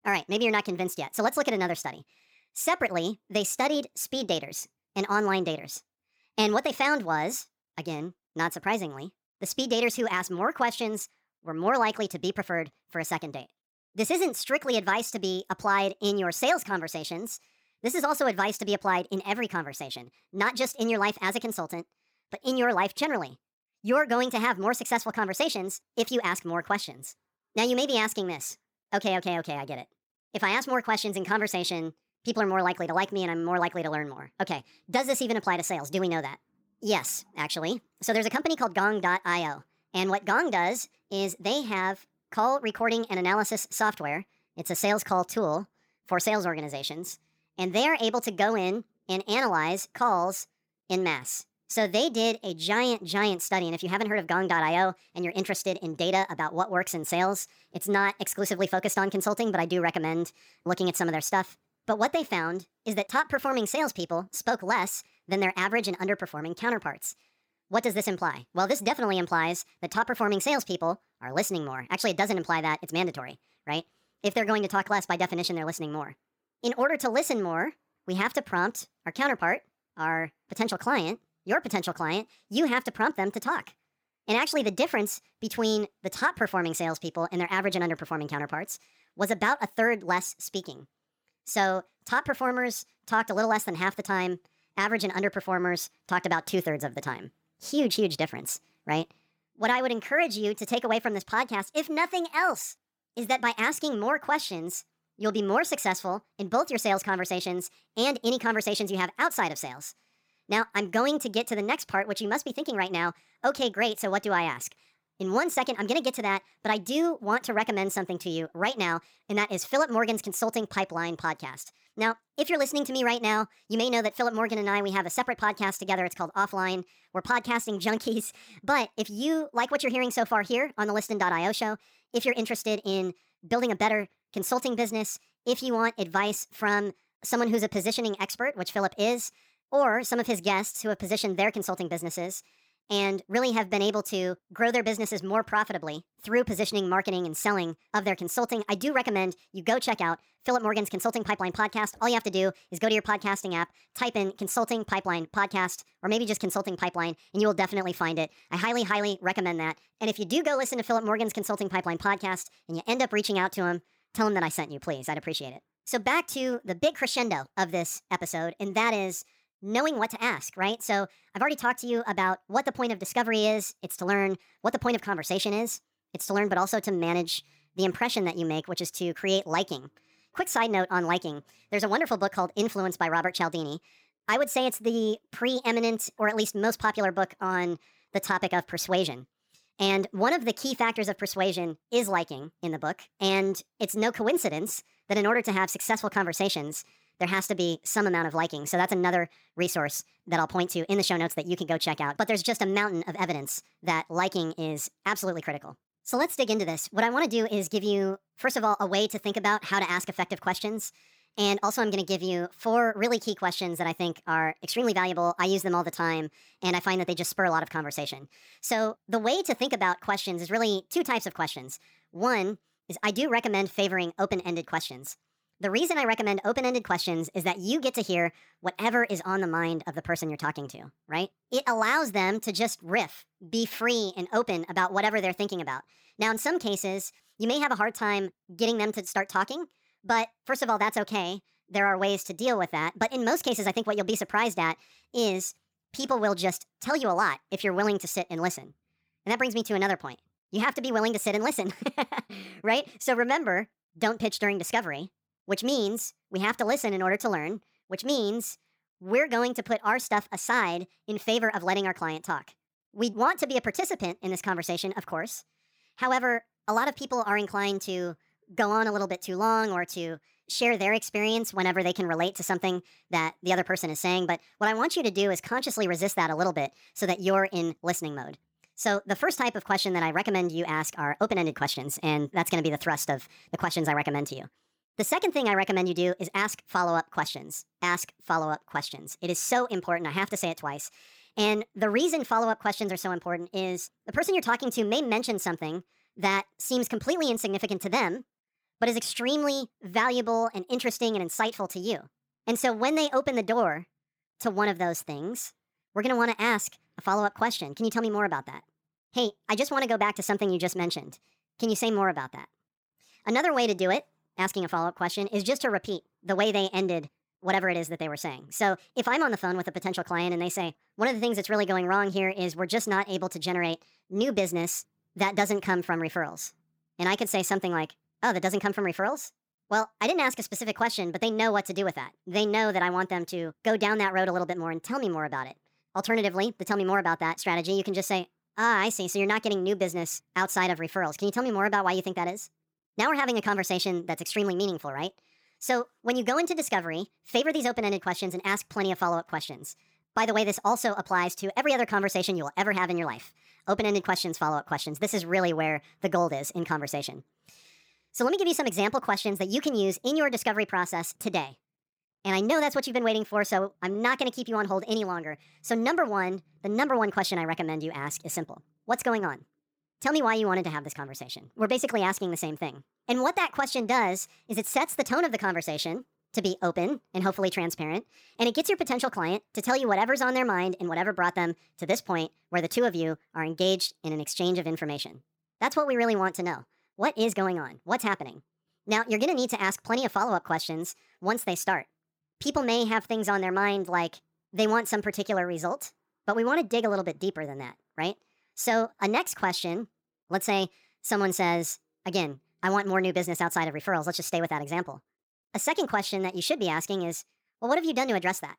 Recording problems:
wrong speed and pitch; too fast and too high; 1.5 times normal speed

